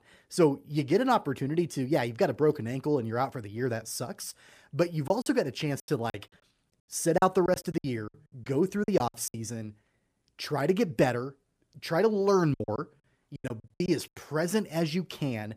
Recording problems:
choppy; very; from 5 to 9.5 s and from 13 to 14 s; 19% of the speech affected

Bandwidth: 15 kHz